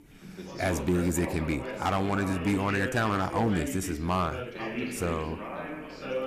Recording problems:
distortion; slight; 5% of the sound clipped
background chatter; loud; throughout; 3 voices, 7 dB below the speech

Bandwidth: 14.5 kHz